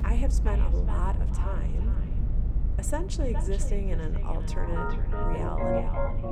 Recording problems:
echo of what is said; strong; throughout; 420 ms later, 10 dB below the speech
background music; very loud; throughout; 5 dB above the speech
low rumble; loud; throughout; 9 dB below the speech
electrical hum; noticeable; throughout; 60 Hz, 20 dB below the speech

